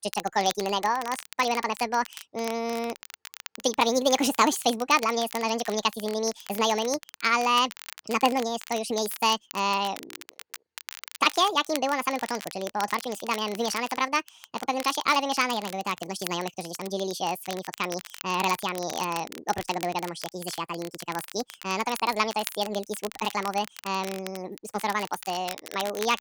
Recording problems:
wrong speed and pitch; too fast and too high; 1.7 times normal speed
crackle, like an old record; noticeable; 15 dB below the speech

